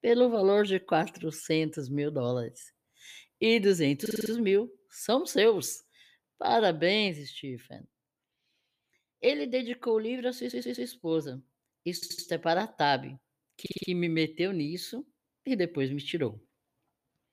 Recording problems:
audio stuttering; 4 times, first at 4 s

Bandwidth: 15 kHz